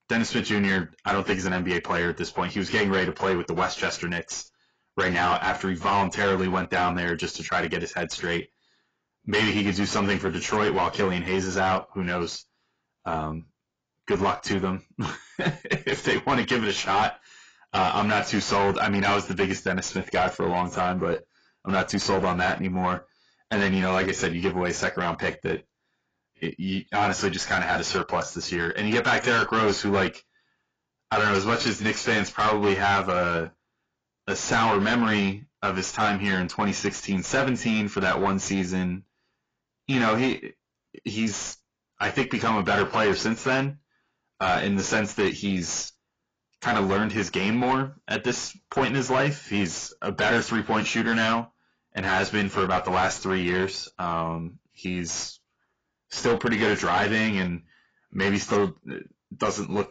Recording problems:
distortion; heavy; 6 dB below the speech
garbled, watery; badly; nothing above 7.5 kHz

